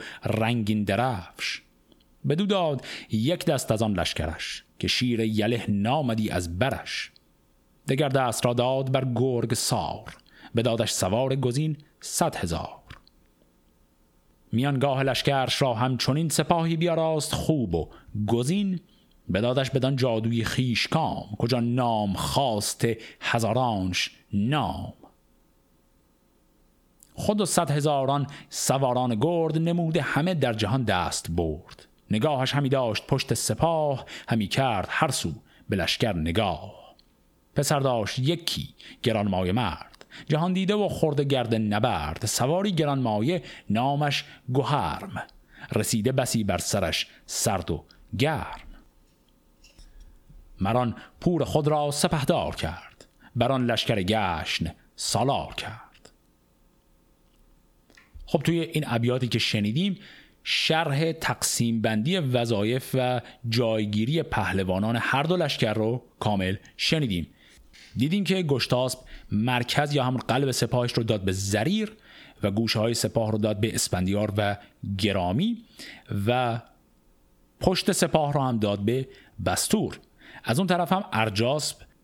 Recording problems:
squashed, flat; heavily

